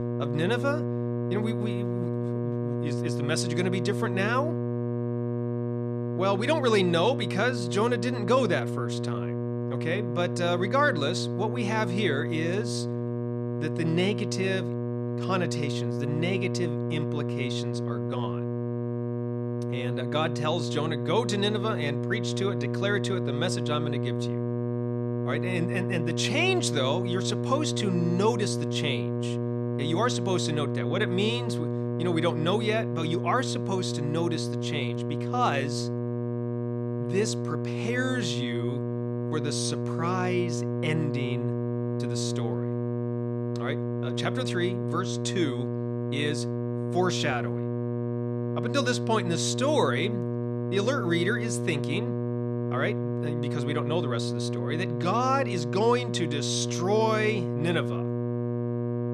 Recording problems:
electrical hum; loud; throughout; 60 Hz, 5 dB below the speech

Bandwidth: 13.5 kHz